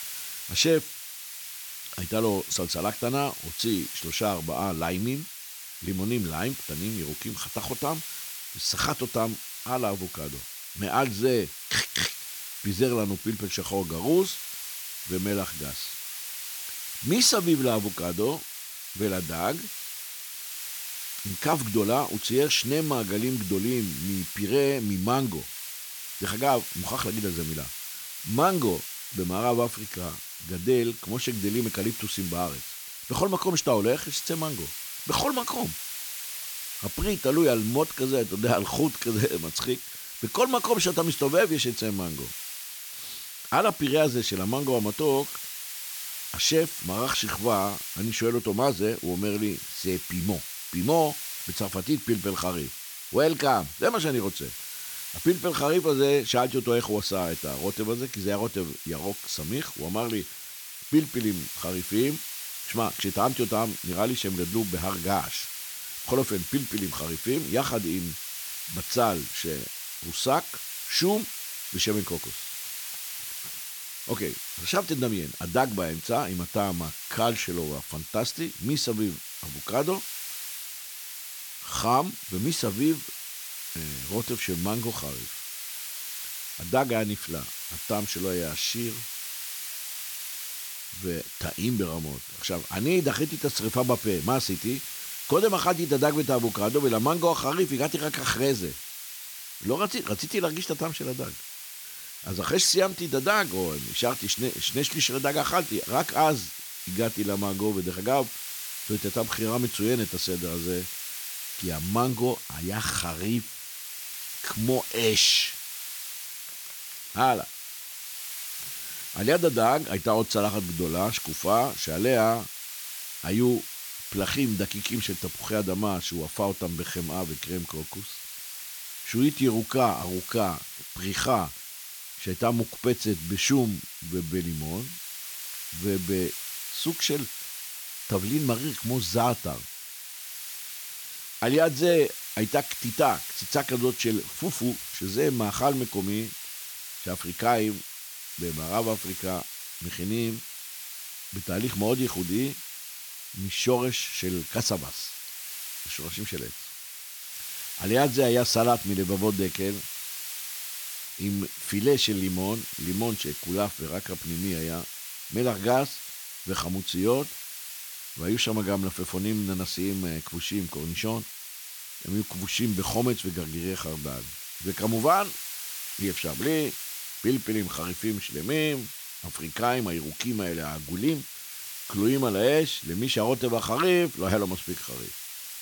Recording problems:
hiss; loud; throughout; 7 dB below the speech

